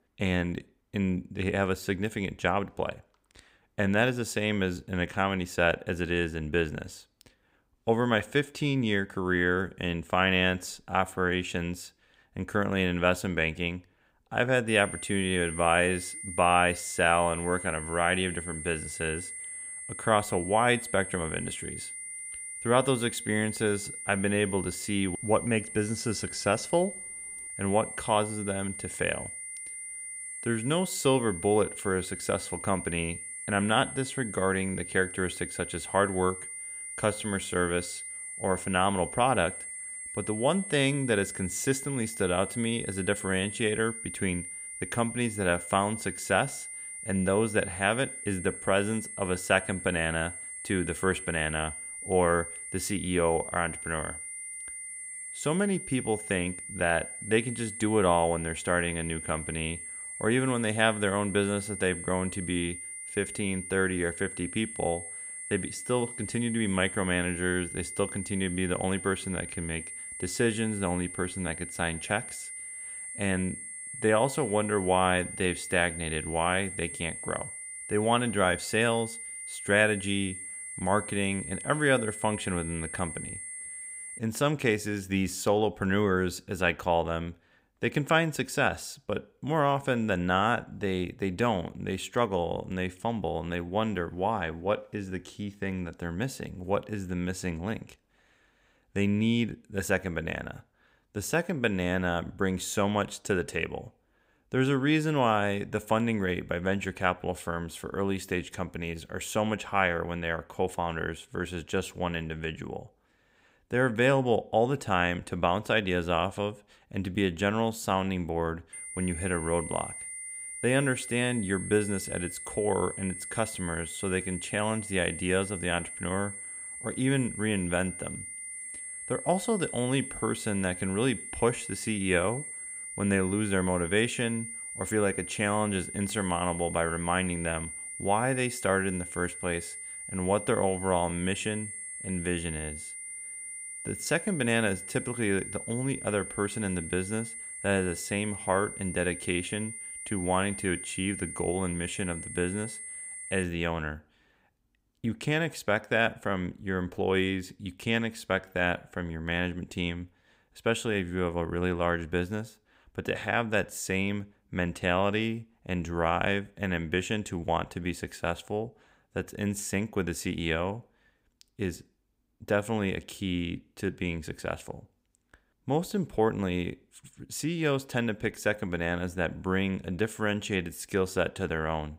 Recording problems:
high-pitched whine; loud; from 15 s to 1:24 and from 1:59 to 2:33; 9 kHz, 8 dB below the speech

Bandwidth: 15.5 kHz